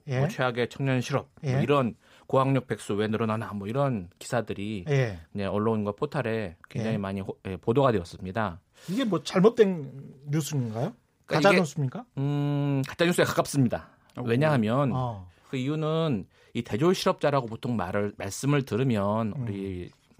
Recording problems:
none

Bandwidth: 15.5 kHz